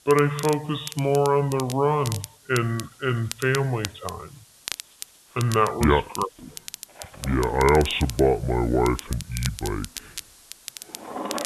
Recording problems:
high frequencies cut off; severe; nothing above 4 kHz
wrong speed and pitch; too slow and too low; 0.7 times normal speed
household noises; noticeable; throughout; 15 dB below the speech
crackle, like an old record; noticeable; 15 dB below the speech
hiss; faint; throughout; 25 dB below the speech

